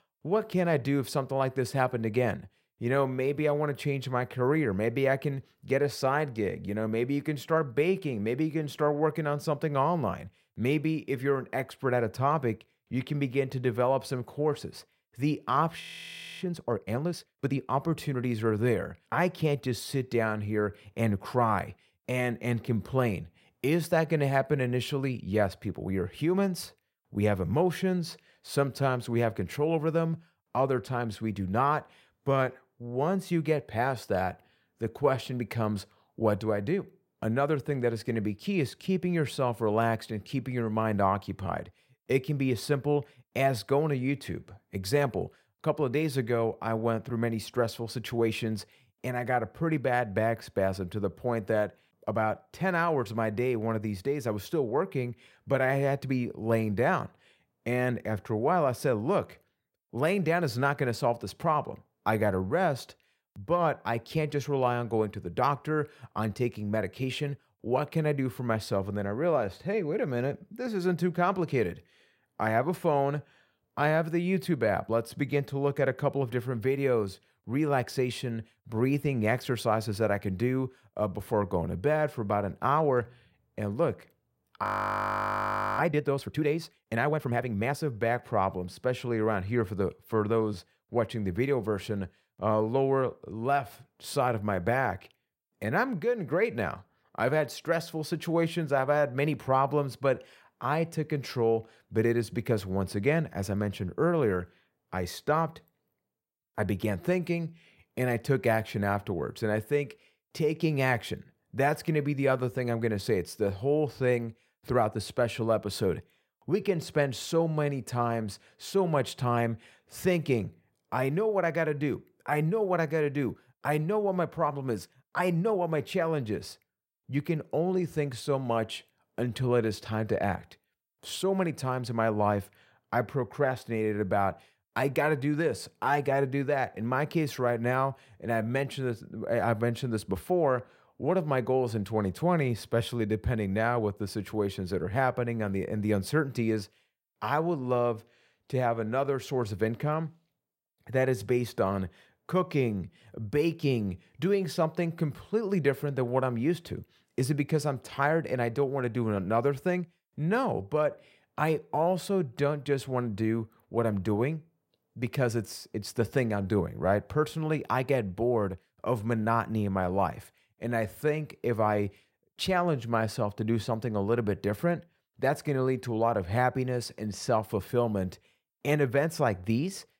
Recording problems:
audio freezing; at 16 s for 0.5 s and at 1:25 for 1 s

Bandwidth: 16 kHz